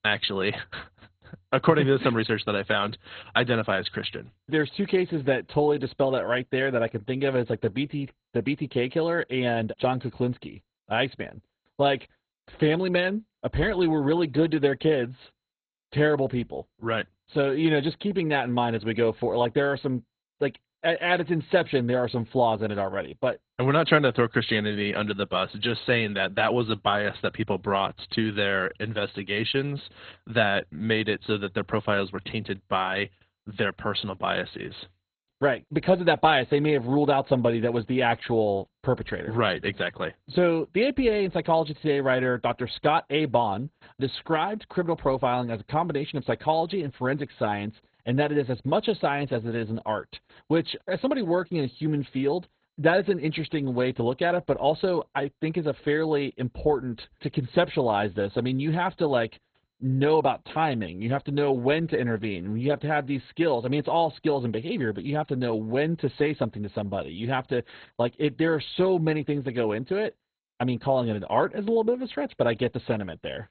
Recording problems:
garbled, watery; badly; nothing above 4 kHz

